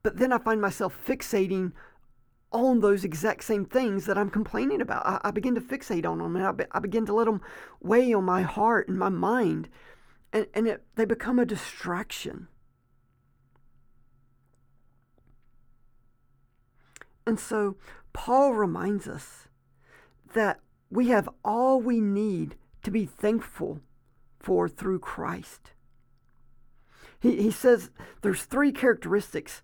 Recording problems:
muffled; very; fading above 3 kHz

